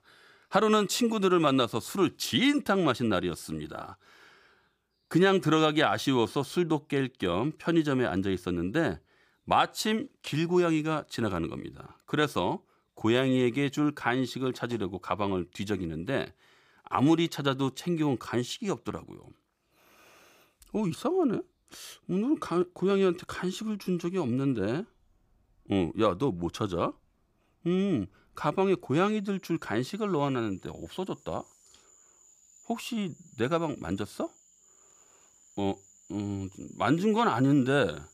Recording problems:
animal sounds; faint; throughout; 30 dB below the speech

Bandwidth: 15 kHz